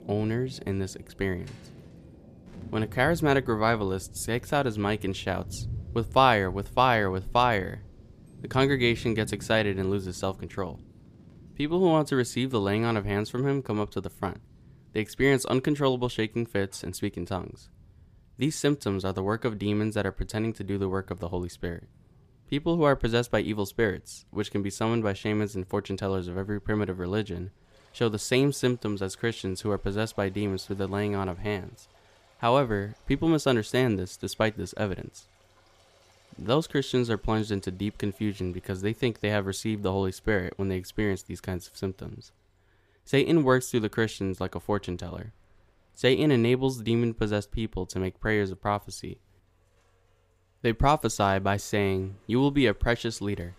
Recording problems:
rain or running water; noticeable; throughout; 20 dB below the speech

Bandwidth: 15 kHz